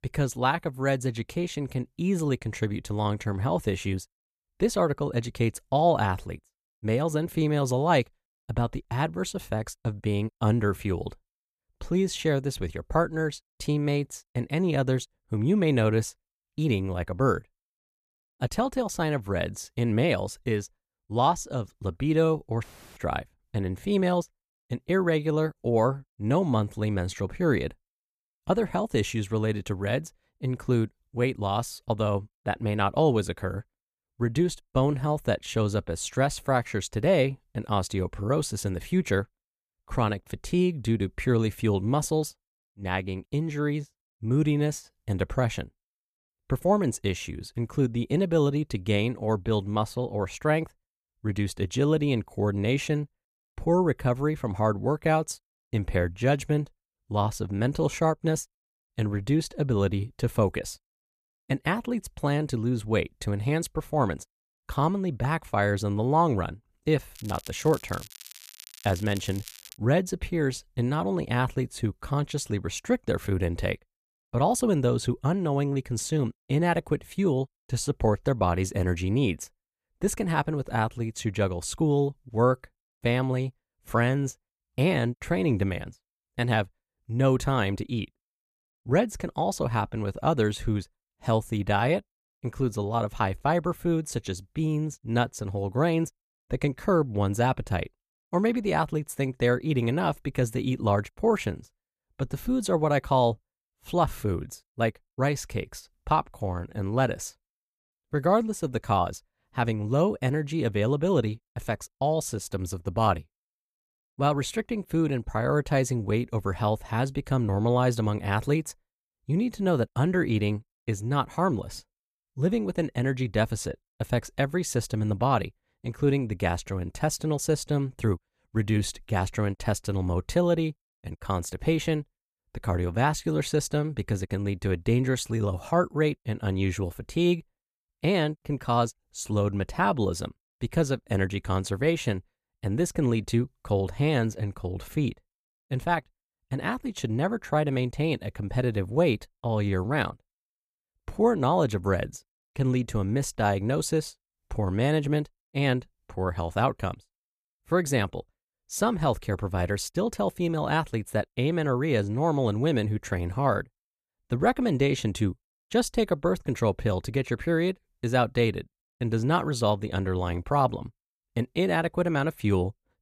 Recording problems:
crackling; noticeable; from 1:07 to 1:10; 15 dB below the speech

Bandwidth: 14.5 kHz